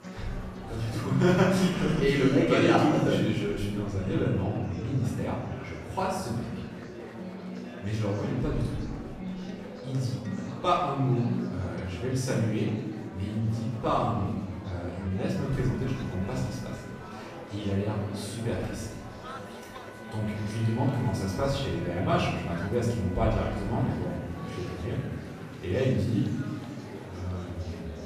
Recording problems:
off-mic speech; far
room echo; noticeable; dies away in 1.2 s
background music; noticeable; throughout; 15 dB below the speech
murmuring crowd; noticeable; throughout; 15 dB below the speech

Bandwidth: 14.5 kHz